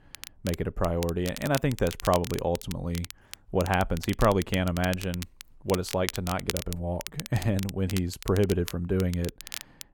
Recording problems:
muffled; slightly; fading above 2 kHz
crackle, like an old record; noticeable; 10 dB below the speech

